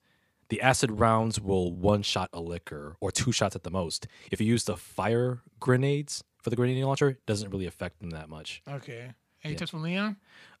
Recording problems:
uneven, jittery; strongly; from 1 to 10 s

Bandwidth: 15 kHz